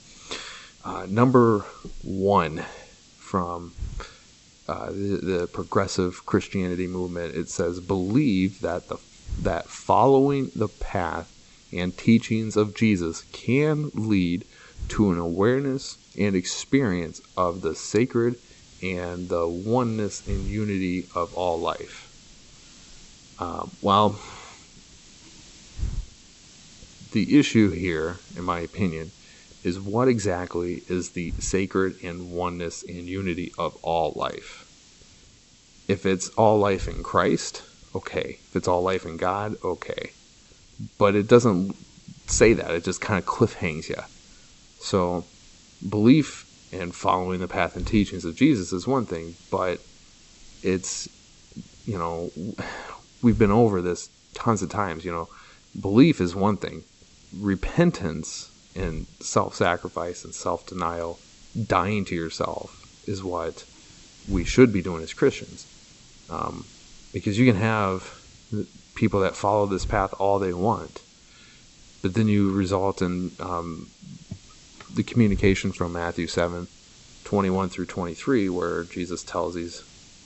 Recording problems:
high frequencies cut off; noticeable; nothing above 8 kHz
hiss; faint; throughout; 20 dB below the speech

